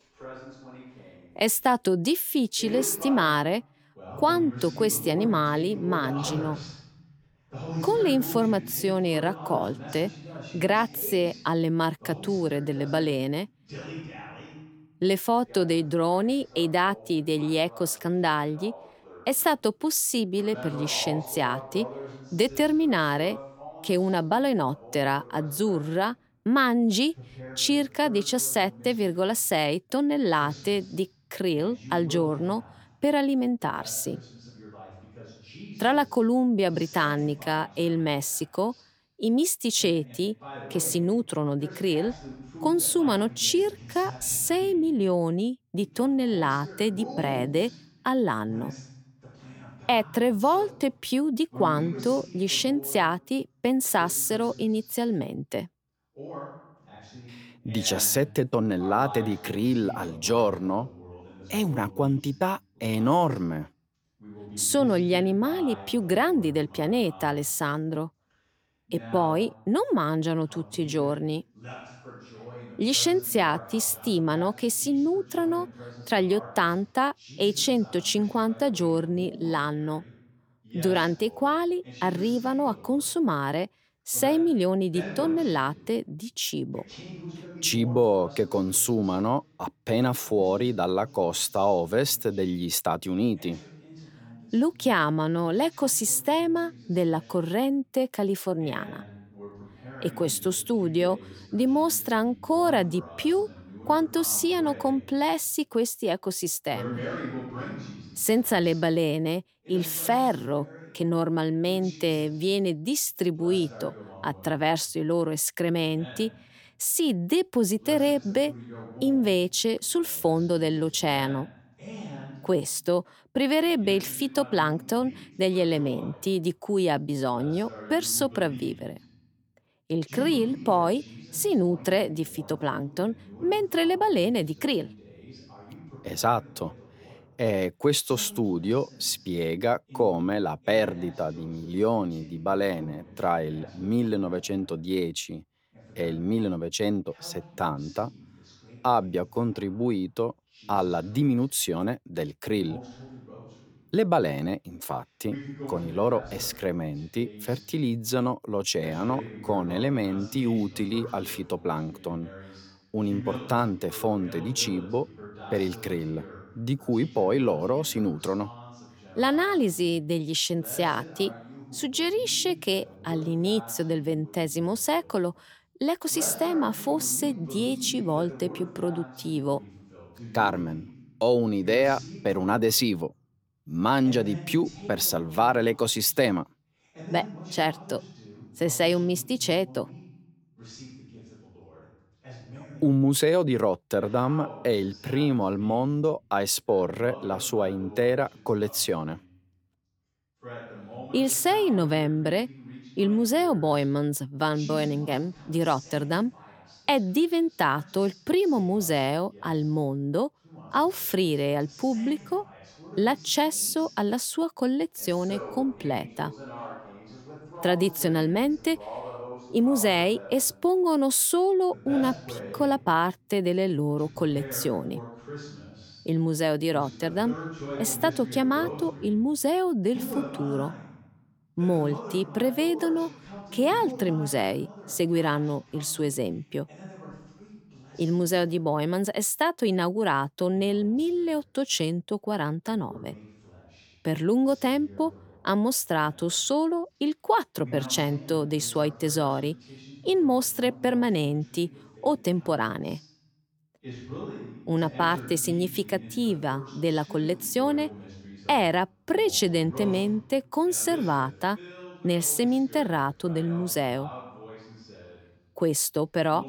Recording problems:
voice in the background; noticeable; throughout; 15 dB below the speech

